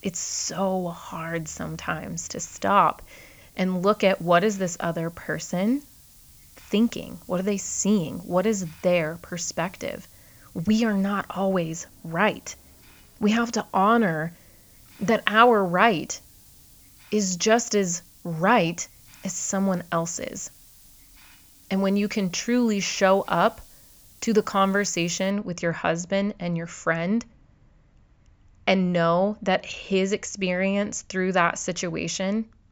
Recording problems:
high frequencies cut off; noticeable; nothing above 8 kHz
hiss; faint; until 25 s; 25 dB below the speech

